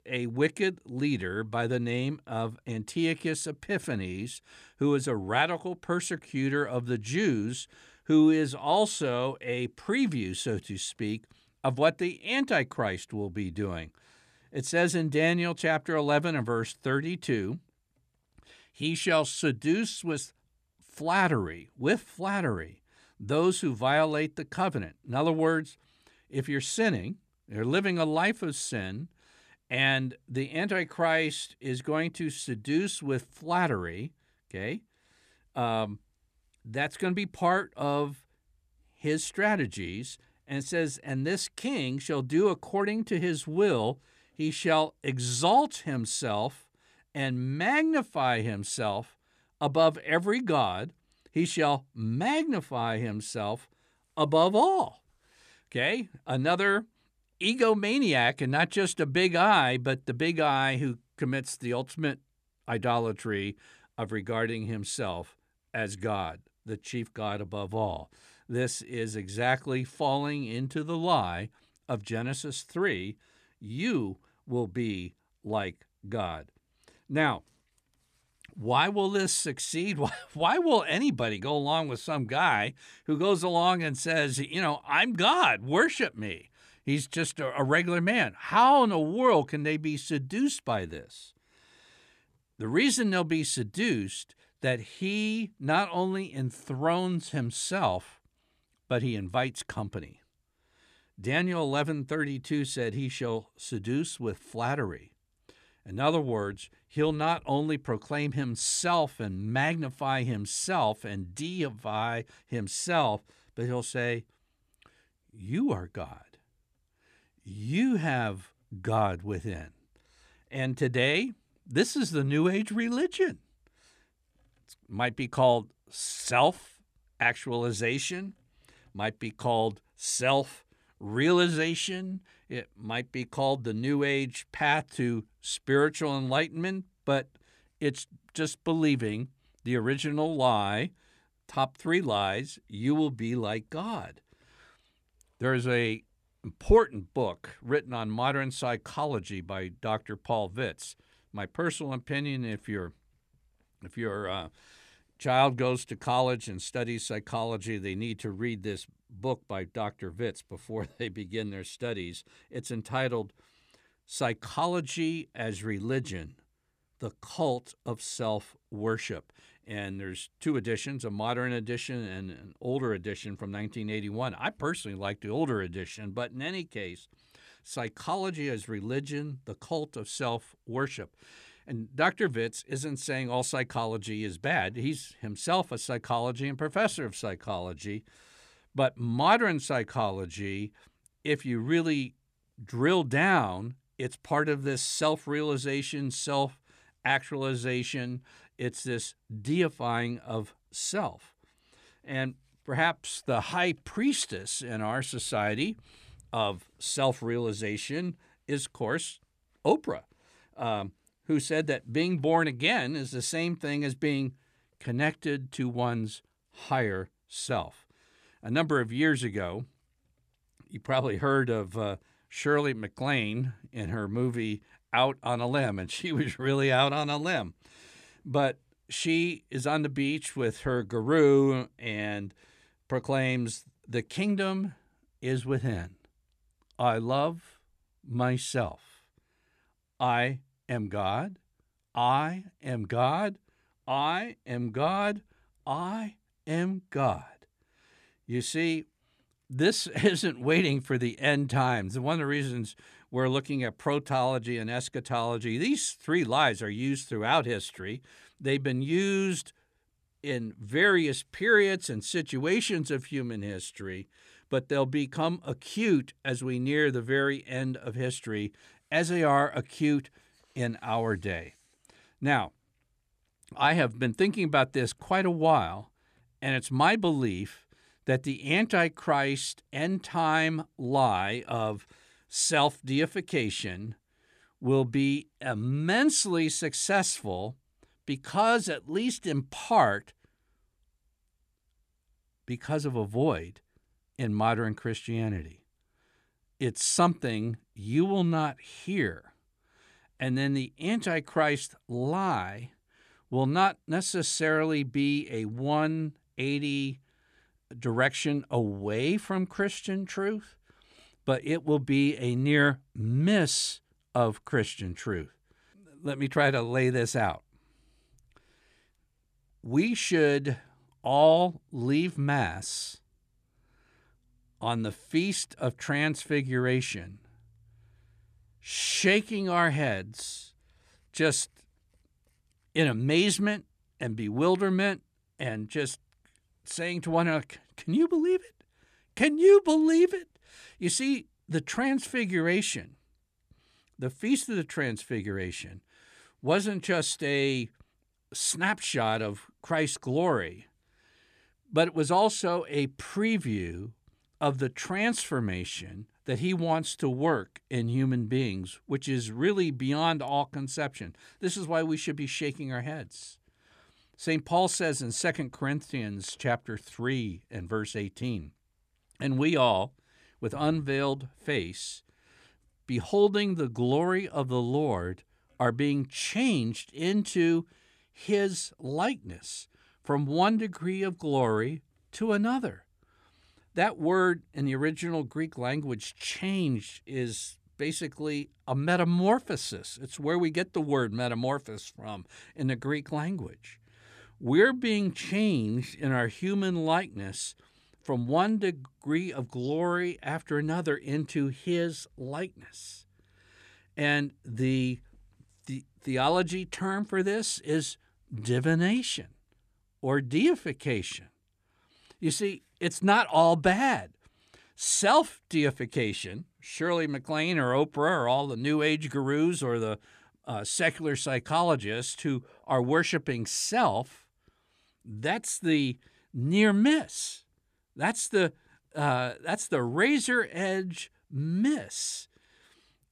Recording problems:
none

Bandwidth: 14.5 kHz